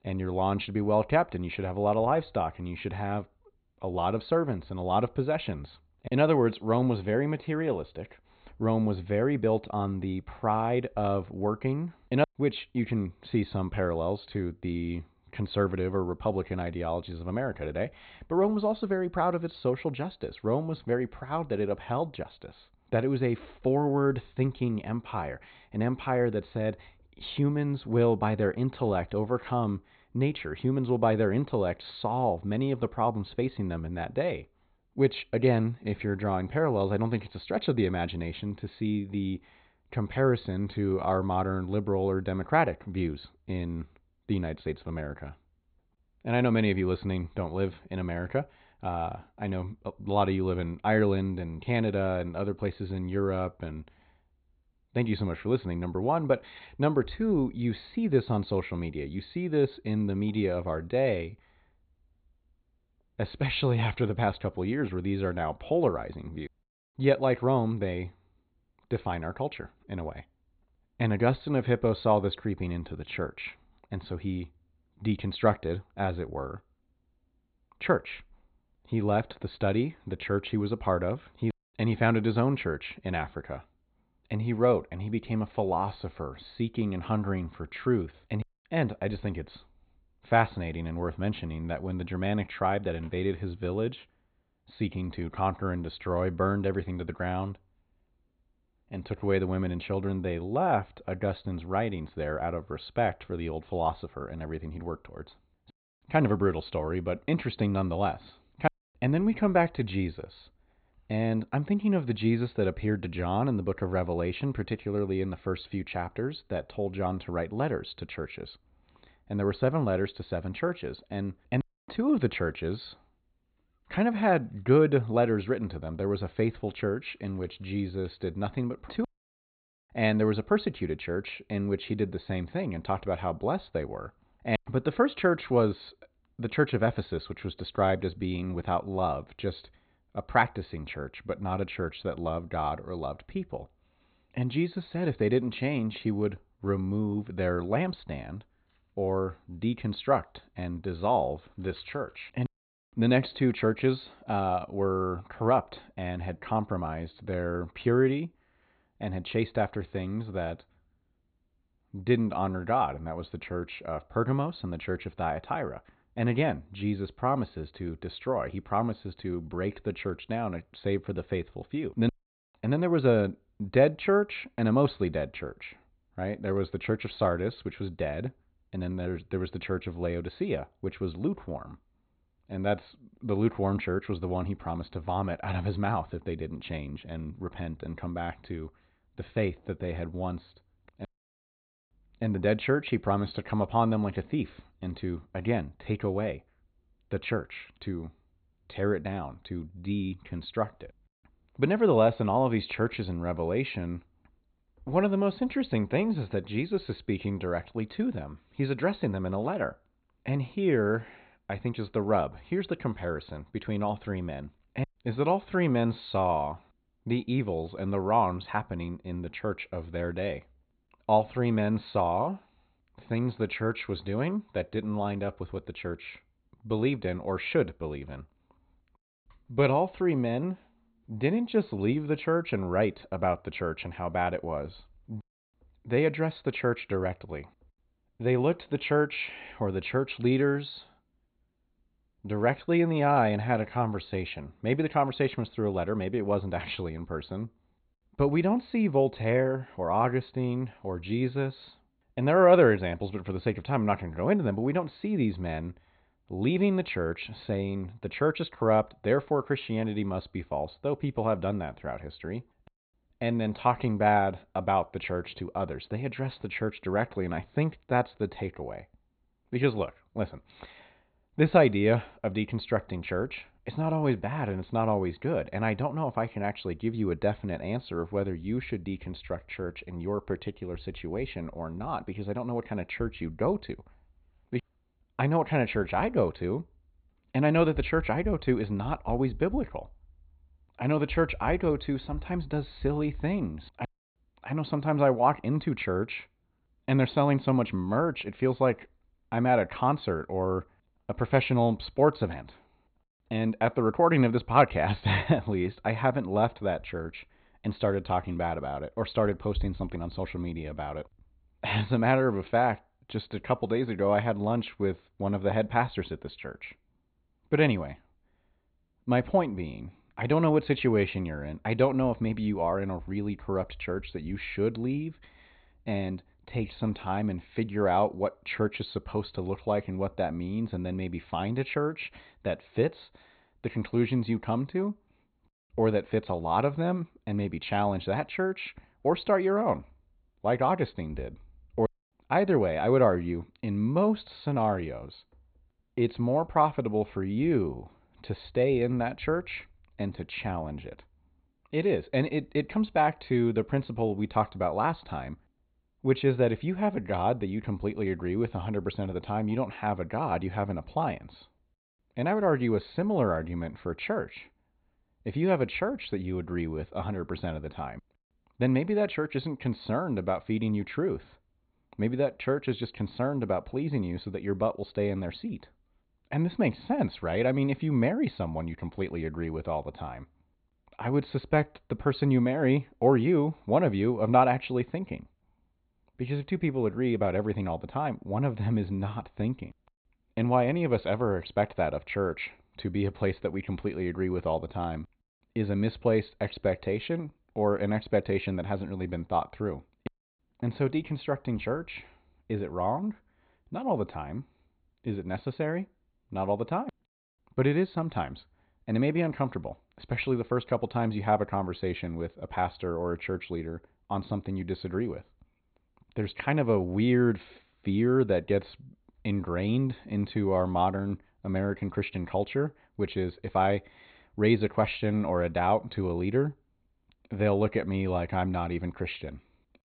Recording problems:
high frequencies cut off; severe; nothing above 4.5 kHz

